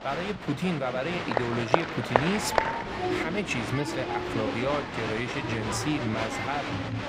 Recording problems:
crowd noise; very loud; throughout; 1 dB above the speech

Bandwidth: 15.5 kHz